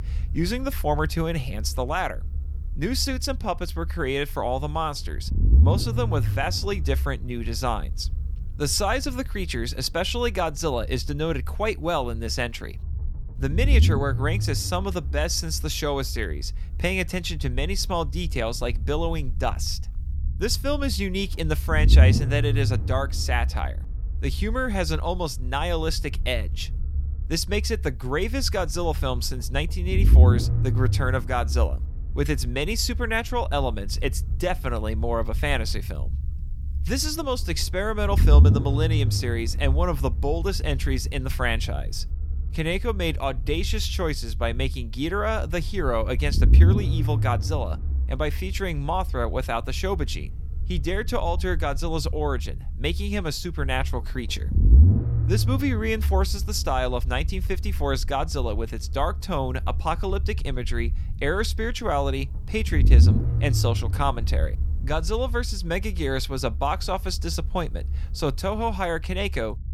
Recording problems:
low rumble; noticeable; throughout; 15 dB below the speech

